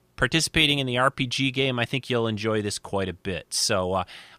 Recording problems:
none

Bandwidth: 15 kHz